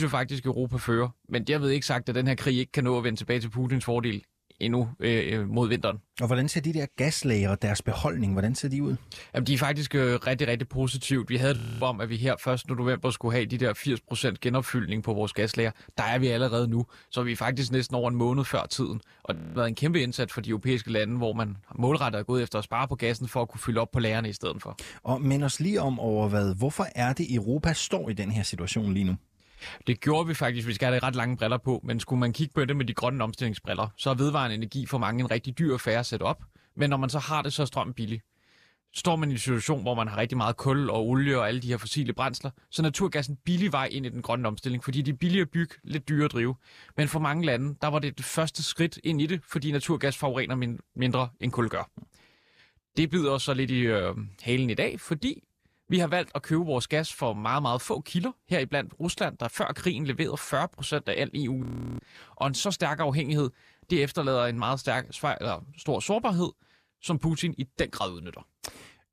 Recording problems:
abrupt cut into speech; at the start
audio freezing; at 12 s, at 19 s and at 1:02

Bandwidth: 14.5 kHz